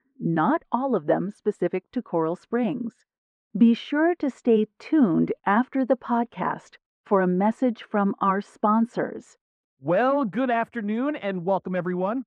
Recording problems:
muffled; very; fading above 3 kHz

